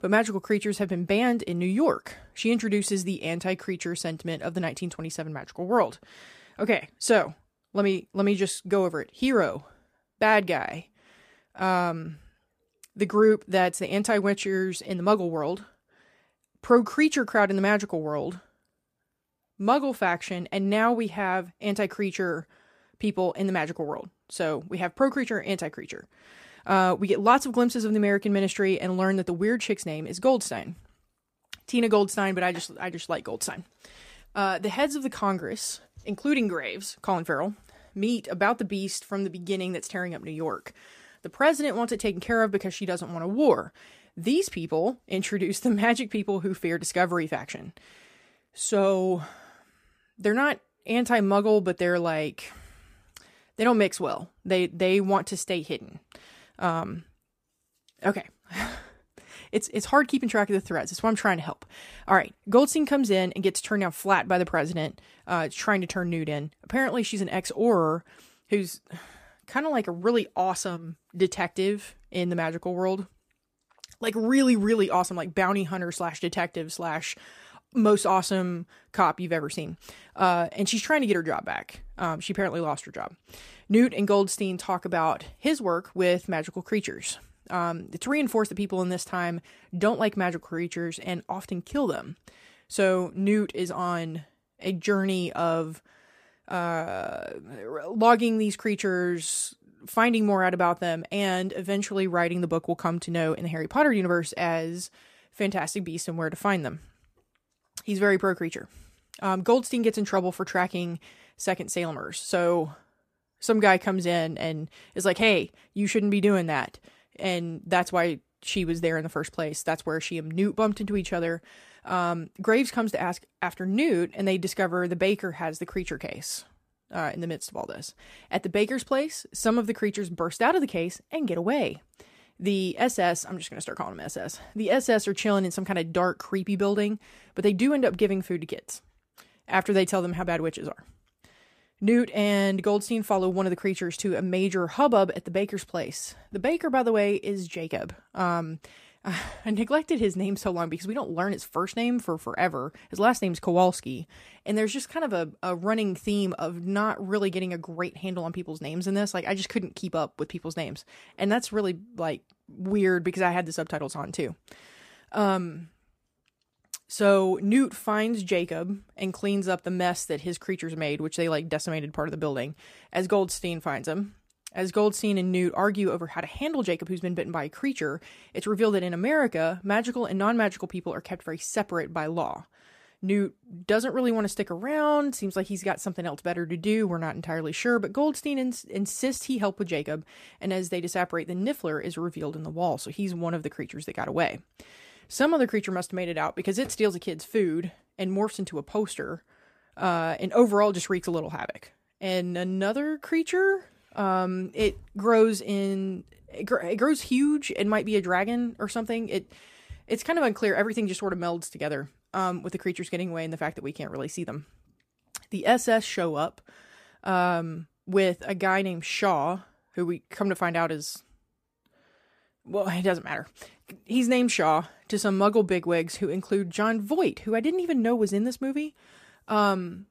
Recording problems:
none

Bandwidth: 15 kHz